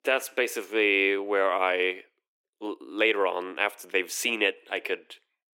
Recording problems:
thin; somewhat; fading below 350 Hz

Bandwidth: 16.5 kHz